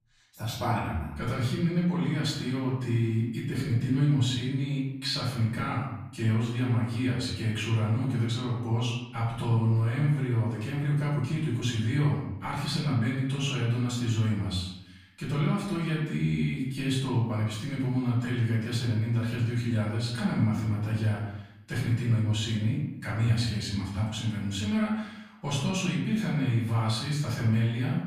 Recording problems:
off-mic speech; far
room echo; noticeable; dies away in 0.8 s

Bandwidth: 15 kHz